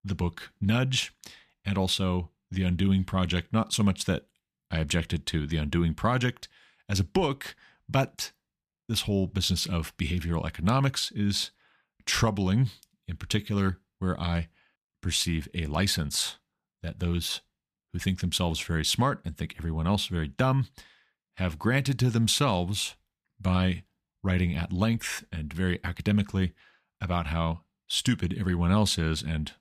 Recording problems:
none

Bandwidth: 14.5 kHz